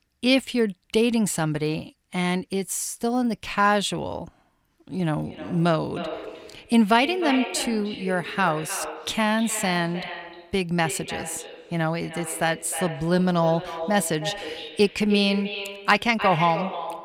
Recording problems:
echo of what is said; strong; from 5 s on; 310 ms later, 10 dB below the speech

